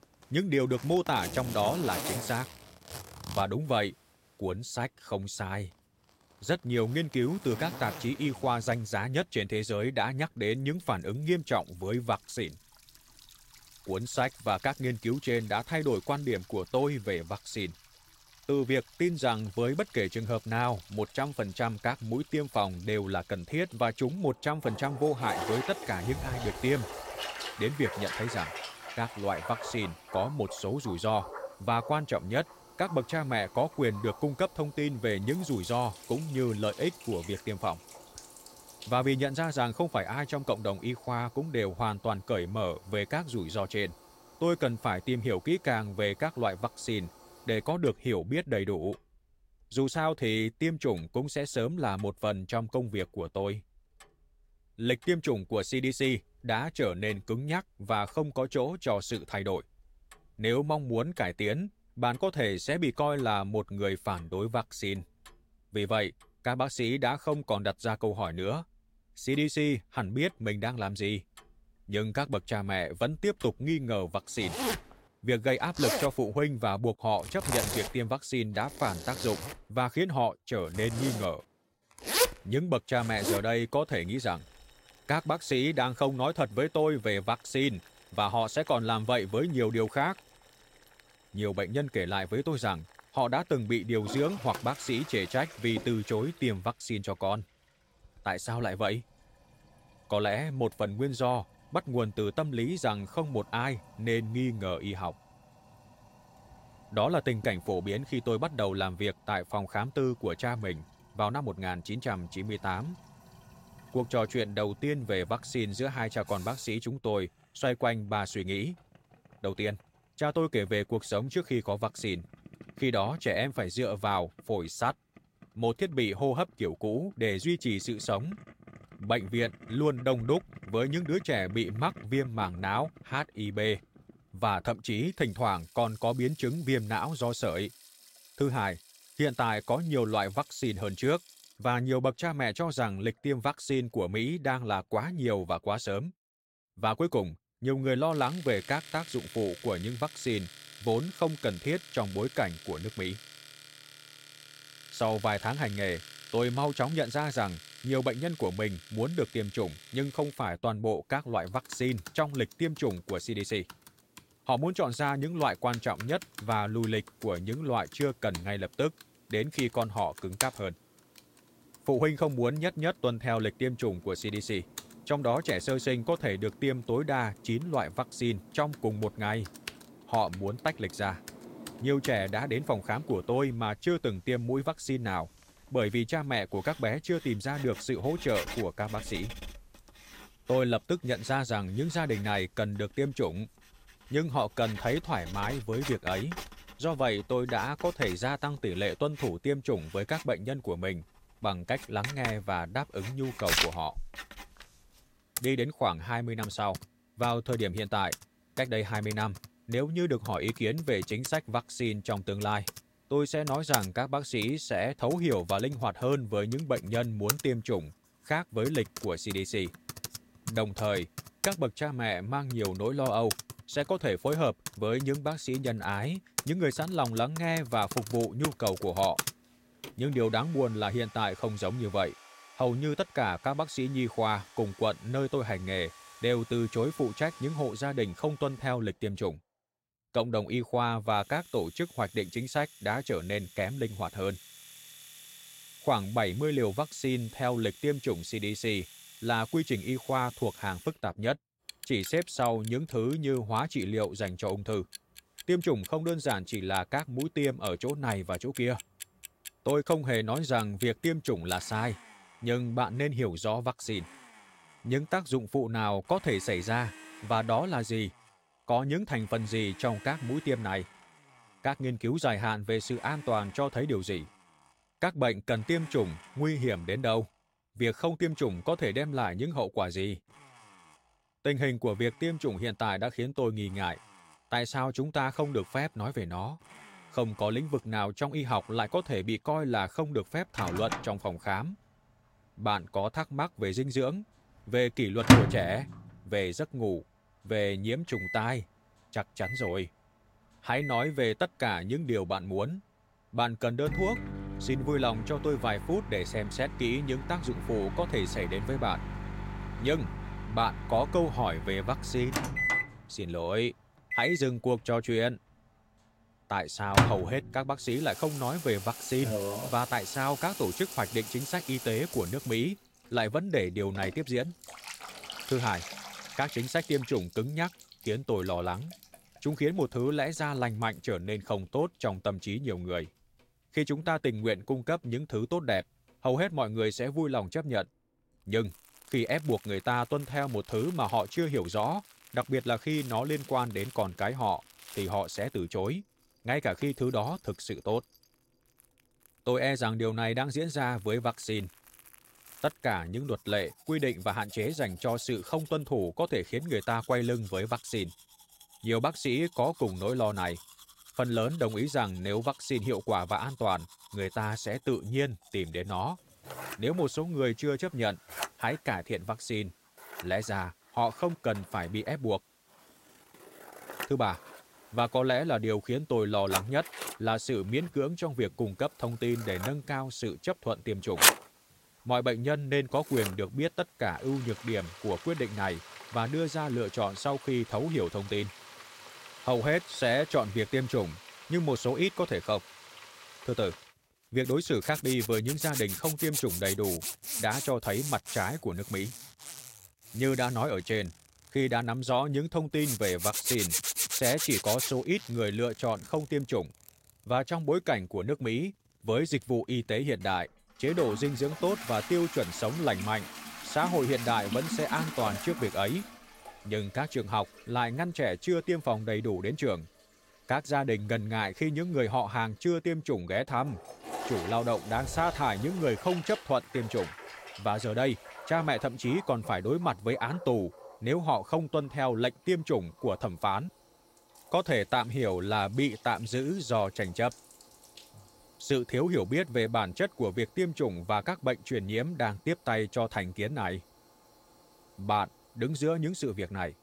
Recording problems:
household noises; loud; throughout; 7 dB below the speech

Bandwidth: 16 kHz